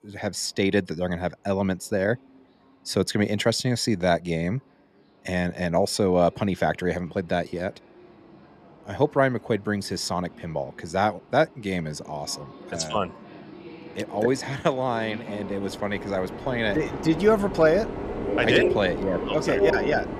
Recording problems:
train or aircraft noise; loud; throughout; 6 dB below the speech

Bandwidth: 13.5 kHz